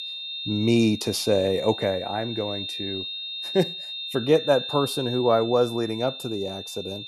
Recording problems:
high-pitched whine; loud; throughout; 3.5 kHz, 7 dB below the speech

